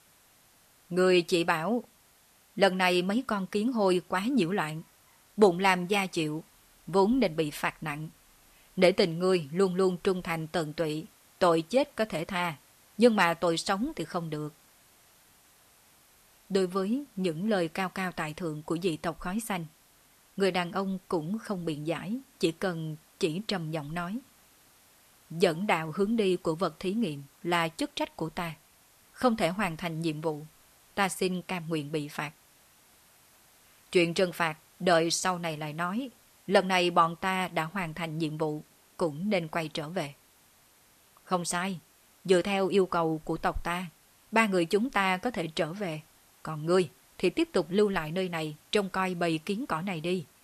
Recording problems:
hiss; faint; throughout; 30 dB below the speech

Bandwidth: 13.5 kHz